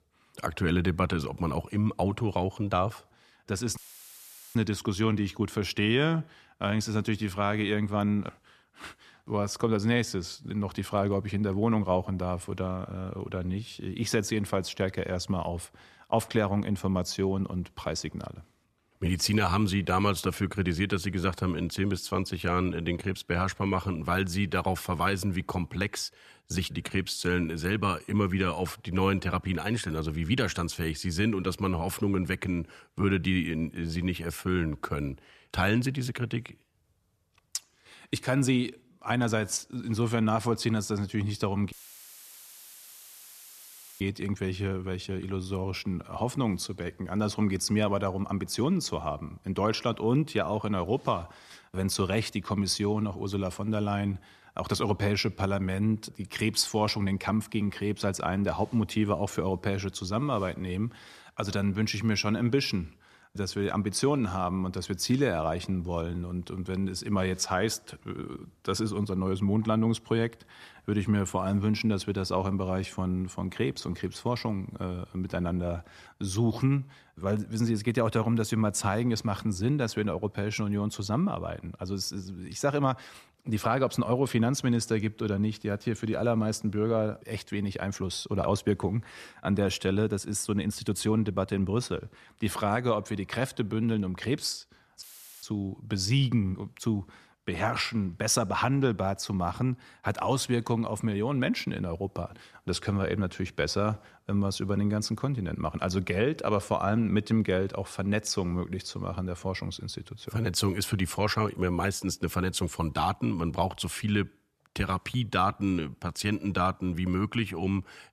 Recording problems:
audio cutting out; filled with static; at 4 s for 1 s, at 42 s for 2.5 s and at 1:35

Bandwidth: 14 kHz